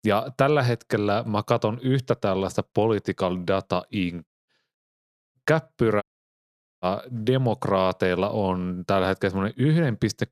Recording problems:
audio cutting out; at 4.5 s, at 5 s for 0.5 s and at 6 s for 1 s

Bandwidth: 14.5 kHz